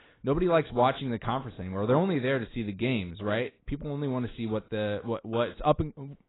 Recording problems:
garbled, watery; badly; nothing above 4 kHz

